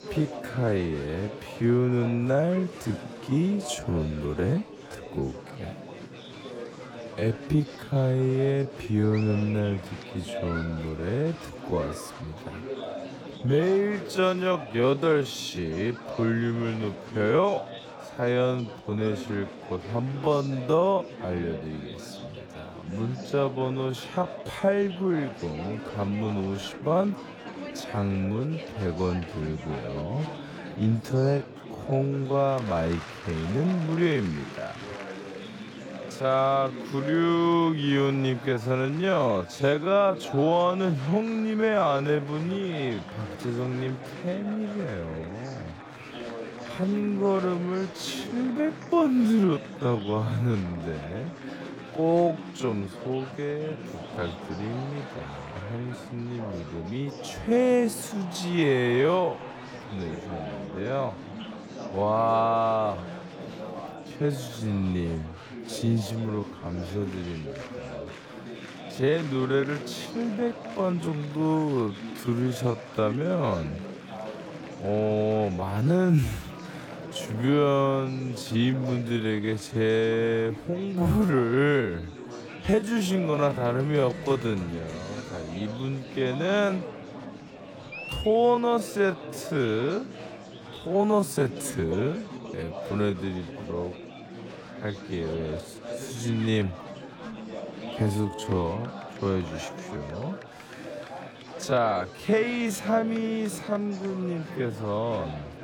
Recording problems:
wrong speed, natural pitch; too slow; 0.5 times normal speed
murmuring crowd; noticeable; throughout; 10 dB below the speech

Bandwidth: 17.5 kHz